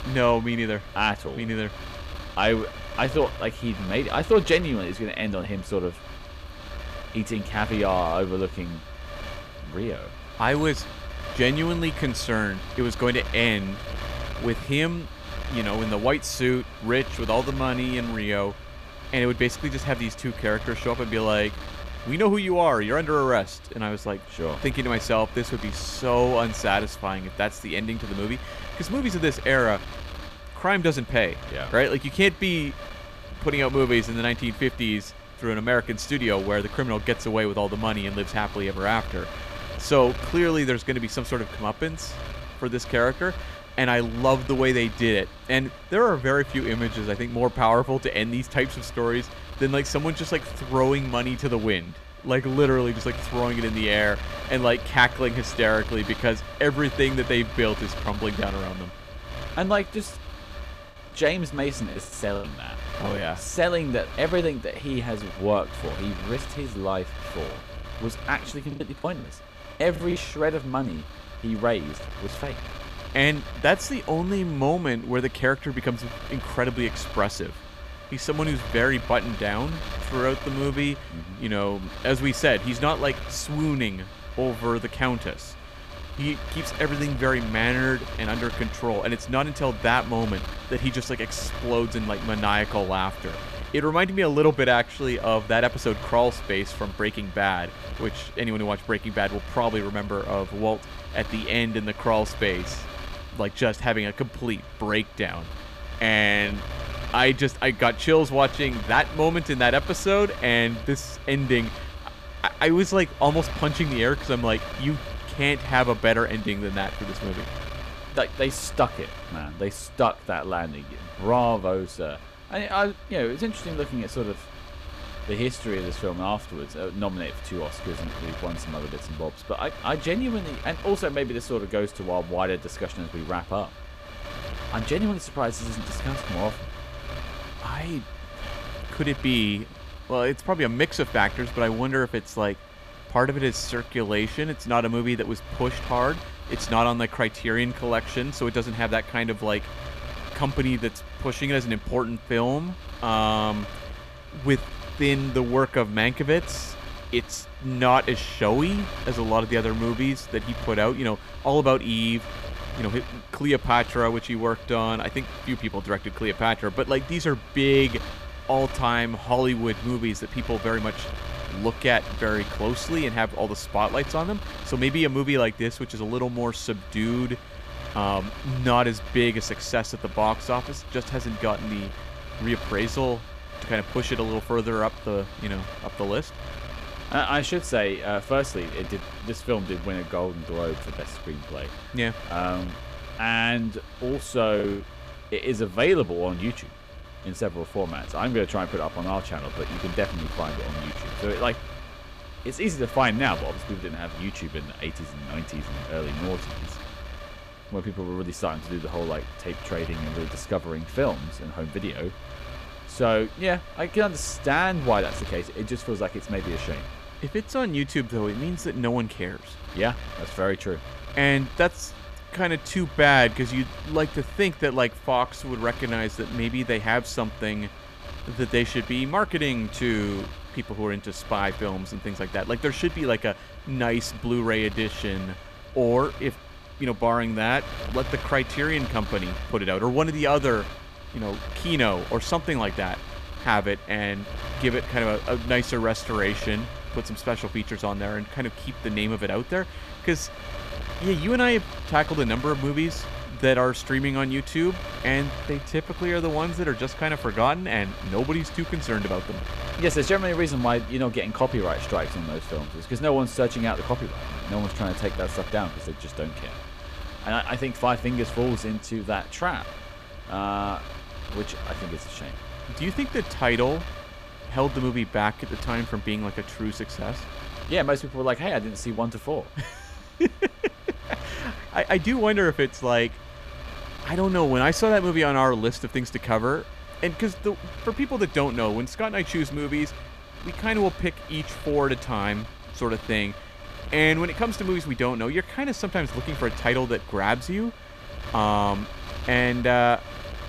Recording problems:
wind noise on the microphone; occasional gusts; 15 dB below the speech
choppy; very; from 1:01 to 1:02, from 1:09 to 1:10 and at 3:15; 10% of the speech affected

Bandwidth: 14.5 kHz